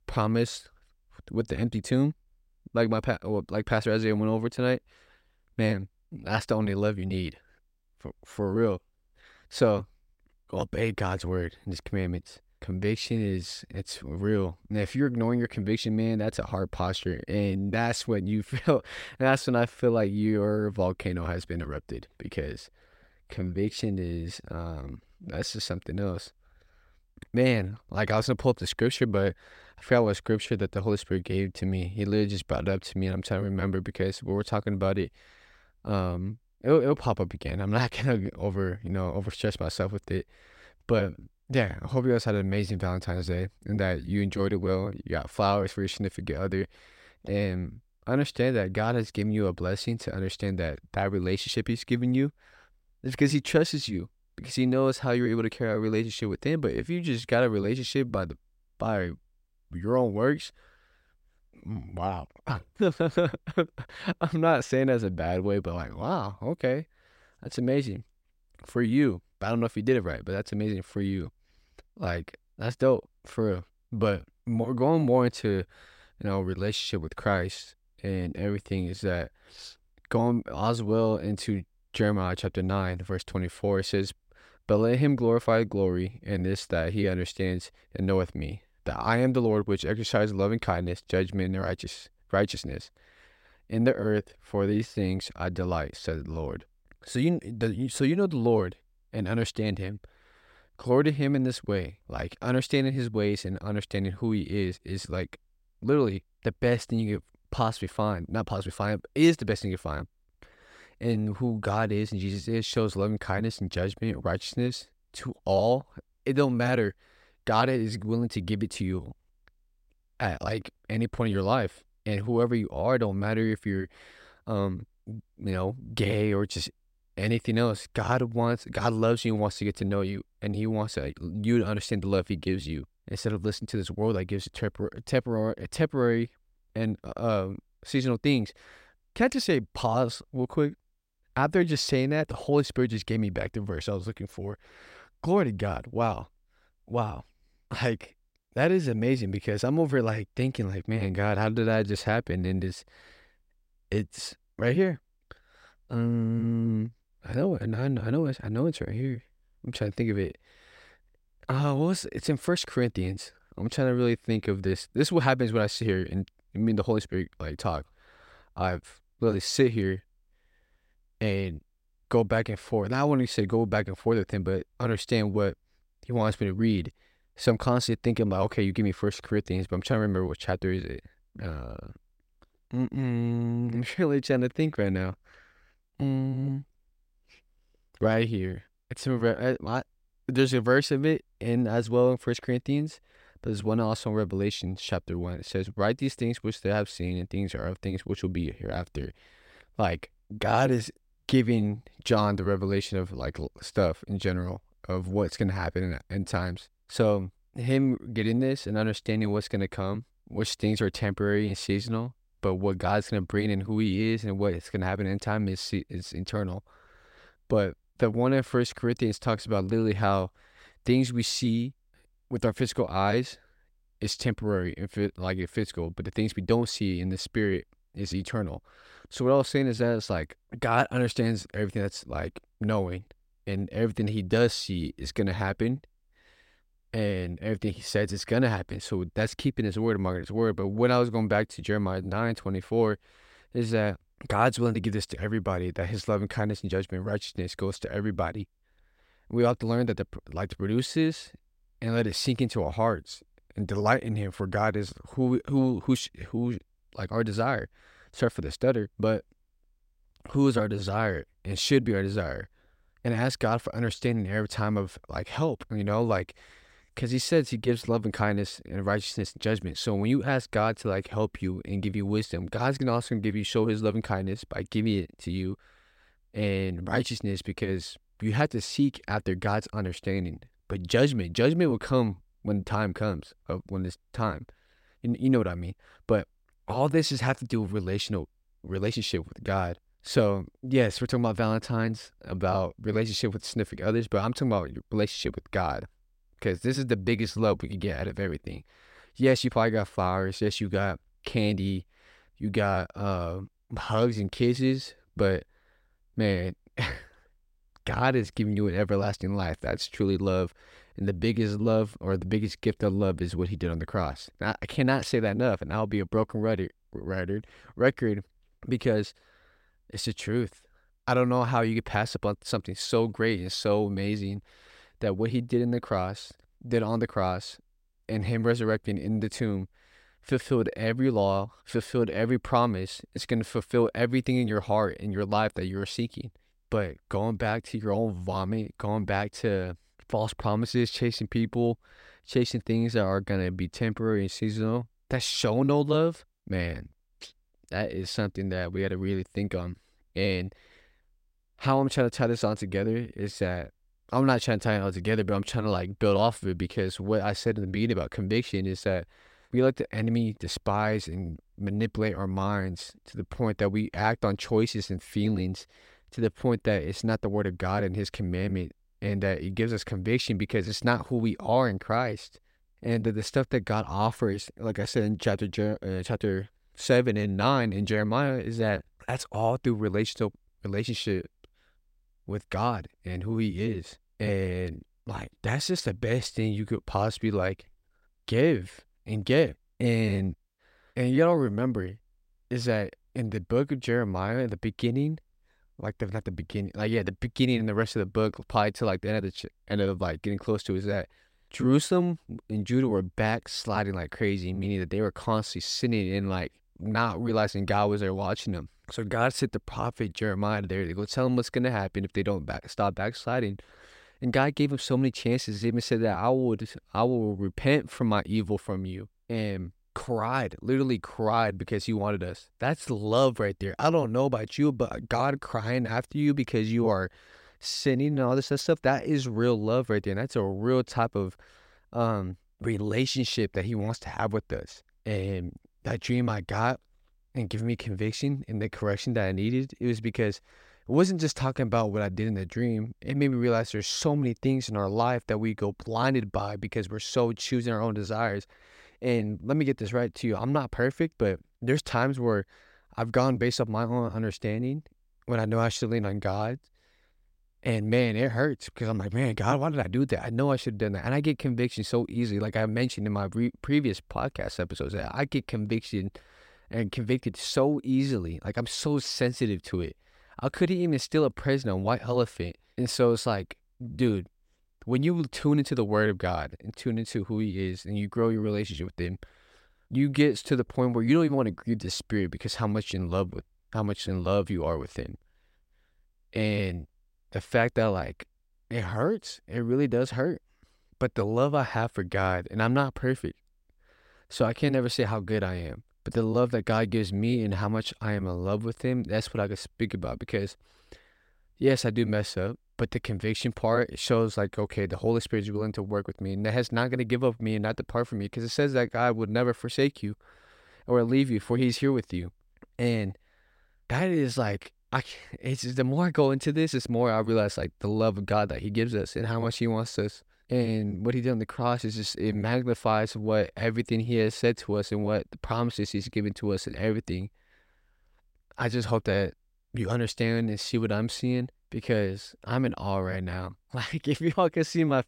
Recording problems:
none

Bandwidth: 16 kHz